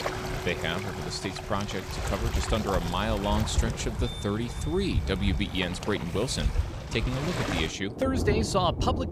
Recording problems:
rain or running water; loud; throughout; 2 dB below the speech
background music; noticeable; throughout; 15 dB below the speech

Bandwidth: 15 kHz